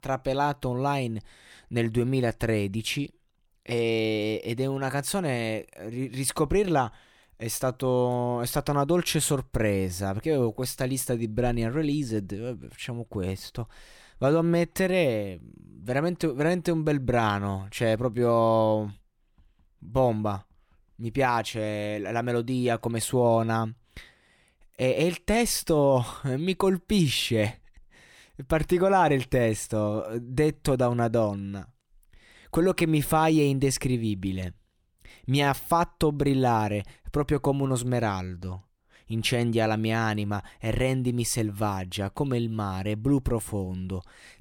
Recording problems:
none

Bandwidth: 18.5 kHz